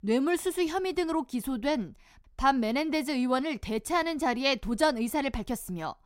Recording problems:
none

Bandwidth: 16 kHz